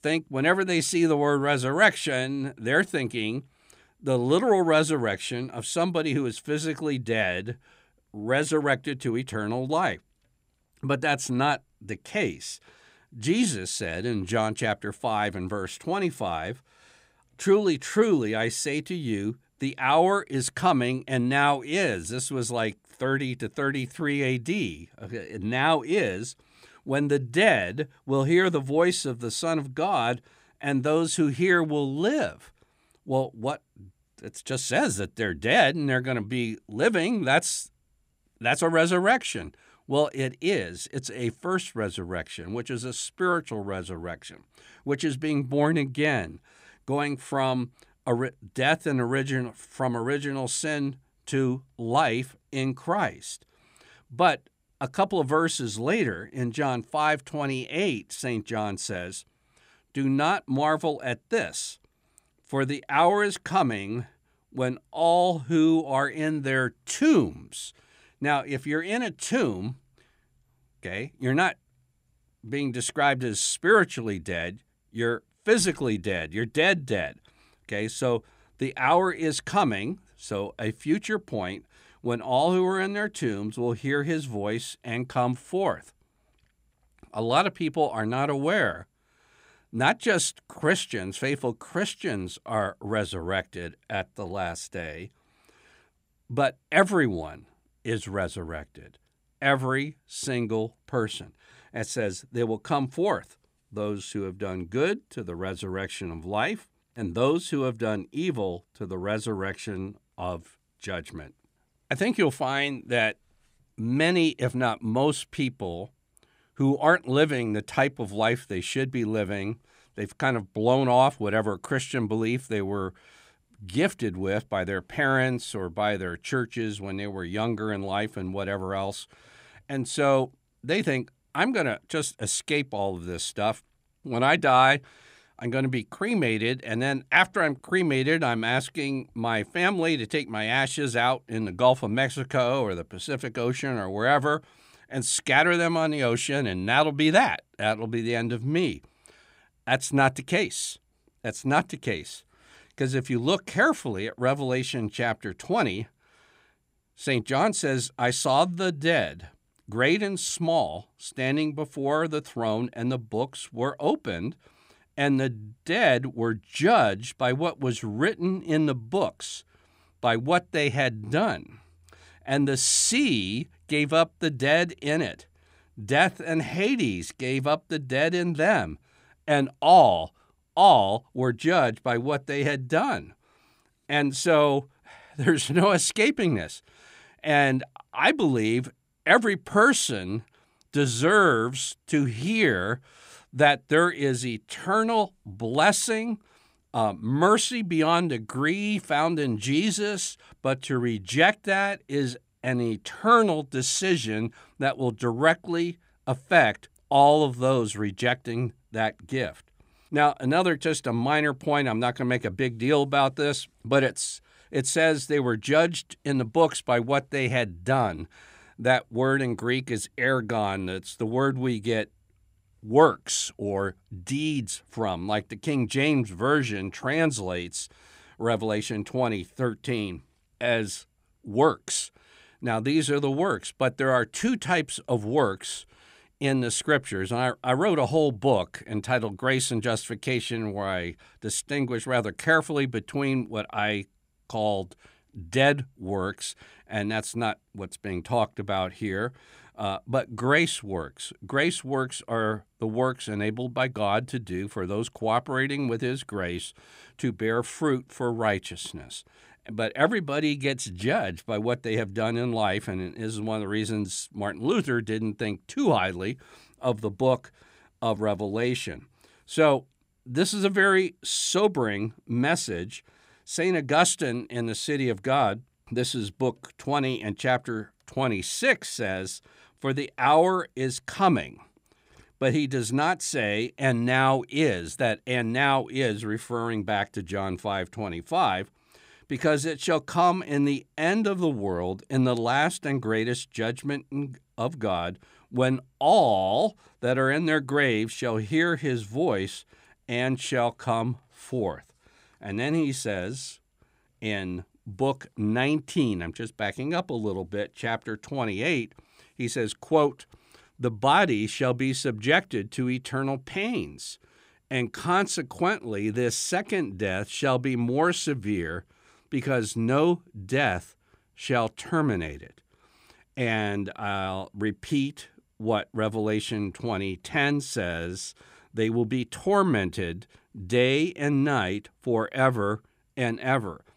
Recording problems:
none

